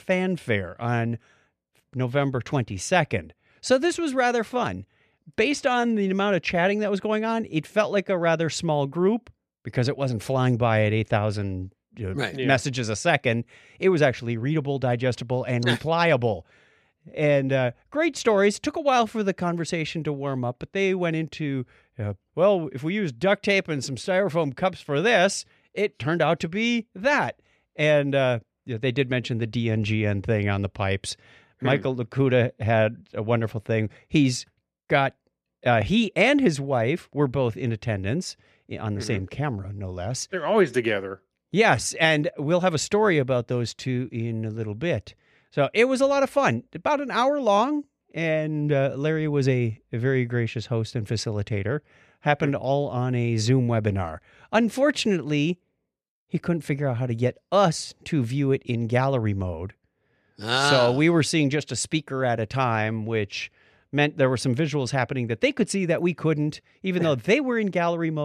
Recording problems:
abrupt cut into speech; at the end

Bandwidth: 14 kHz